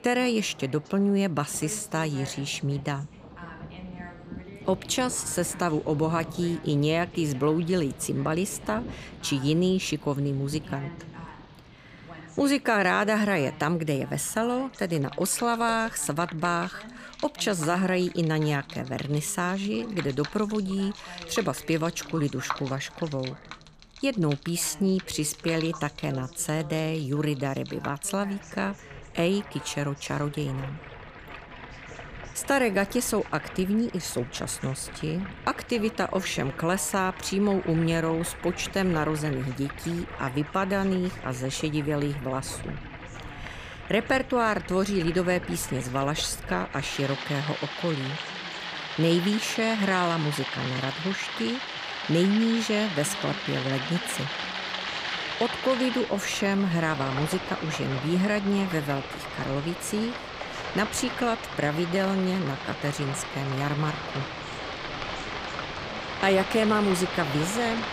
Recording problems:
rain or running water; loud; throughout; 9 dB below the speech
voice in the background; faint; throughout; 20 dB below the speech

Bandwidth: 15 kHz